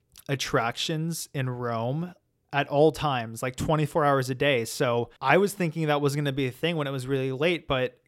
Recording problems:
none

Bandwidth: 16 kHz